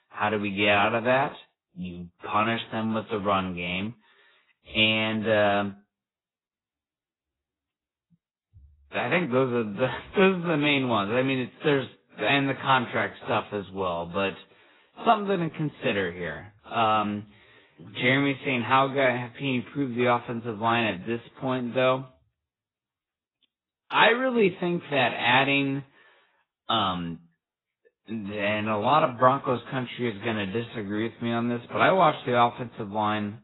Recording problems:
garbled, watery; badly; nothing above 4 kHz
wrong speed, natural pitch; too slow; 0.6 times normal speed

